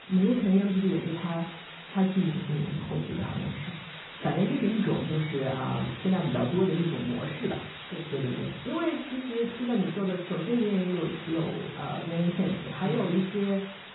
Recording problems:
off-mic speech; far
garbled, watery; badly; nothing above 4 kHz
room echo; slight; dies away in 0.4 s
muffled; very slightly; fading above 1.5 kHz
hiss; noticeable; throughout; 15 dB below the speech

